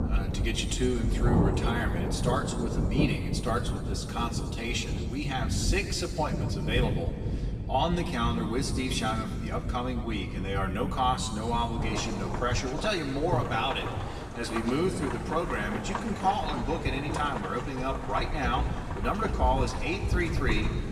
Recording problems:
off-mic speech; far
room echo; slight; dies away in 1.7 s
rain or running water; loud; throughout; 2 dB below the speech

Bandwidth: 15 kHz